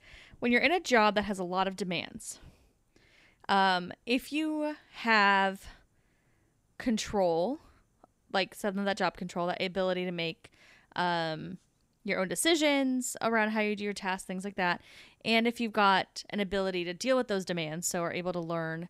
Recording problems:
none

